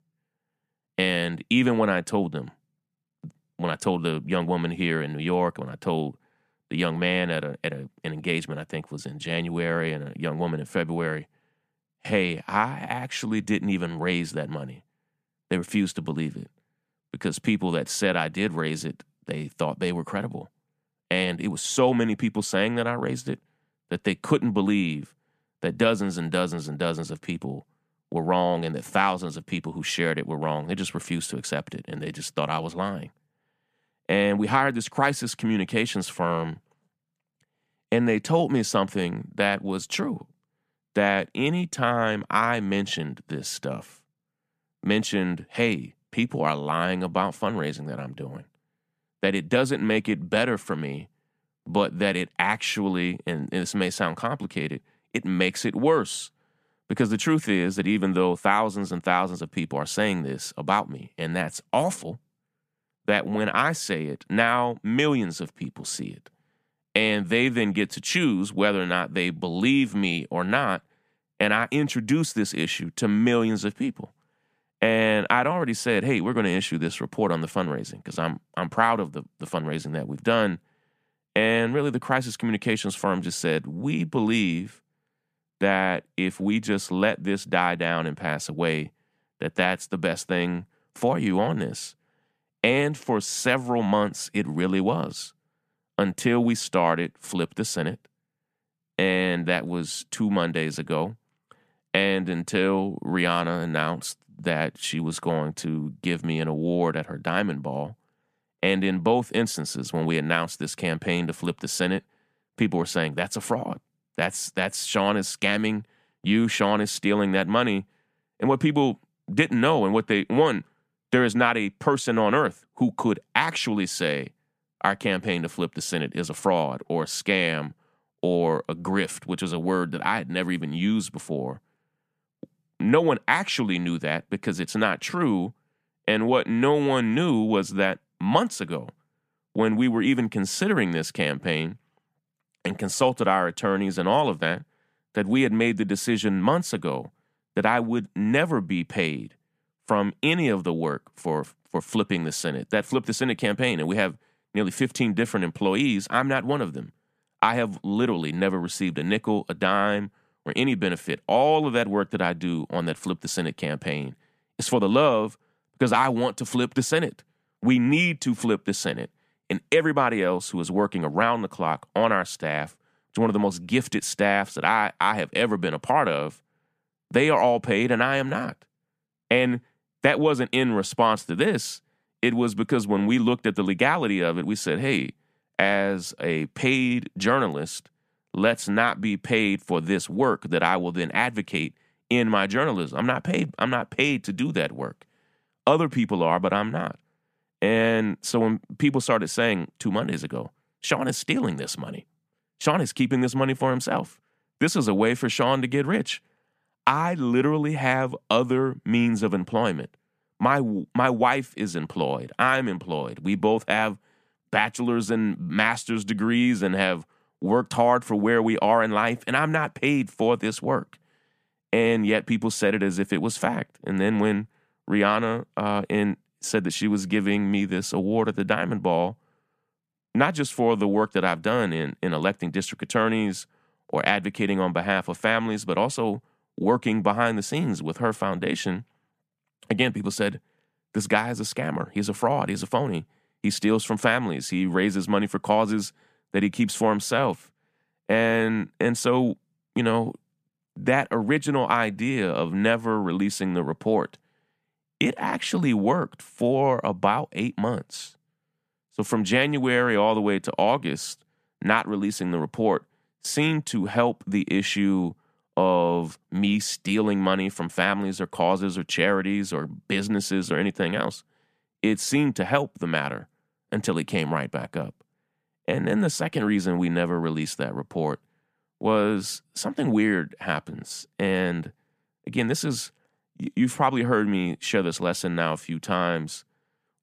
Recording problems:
none

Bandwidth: 14.5 kHz